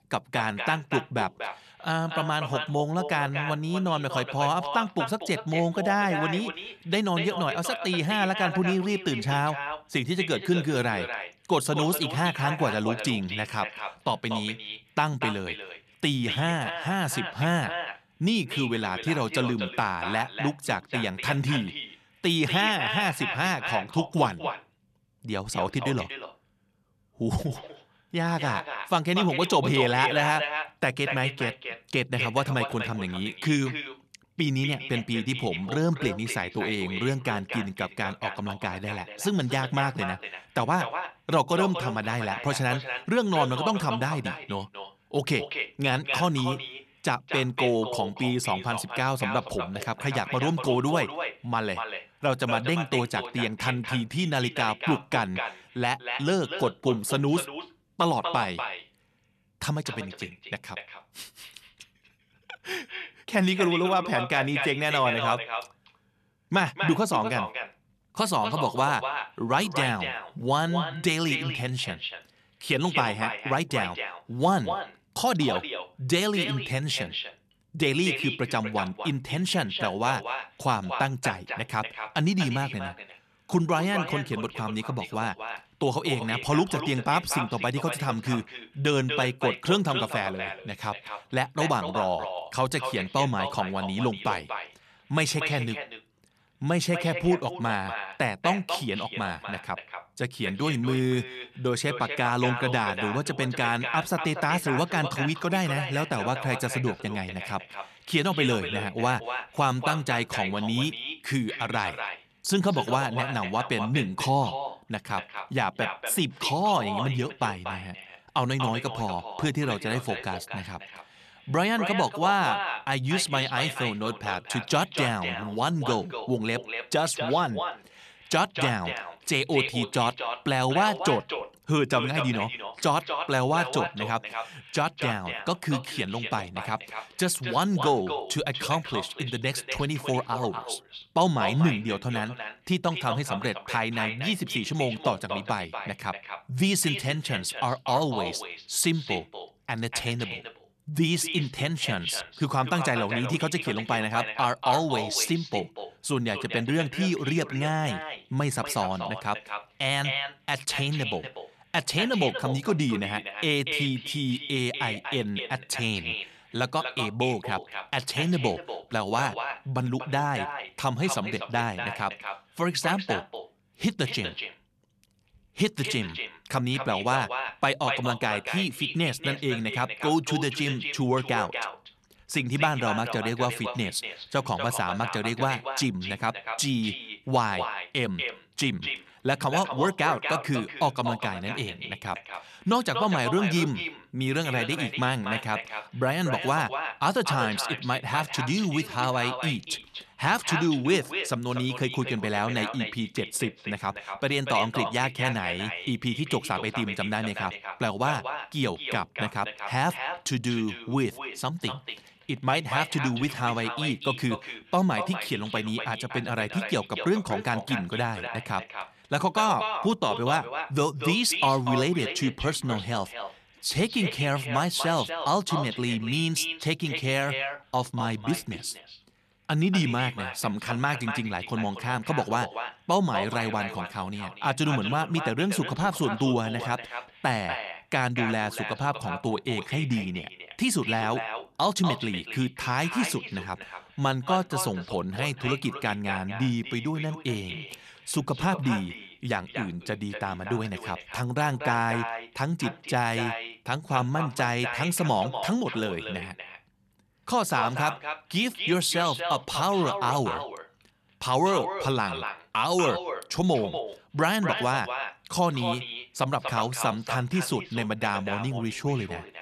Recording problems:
echo of what is said; strong; throughout; 240 ms later, 7 dB below the speech

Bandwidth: 13.5 kHz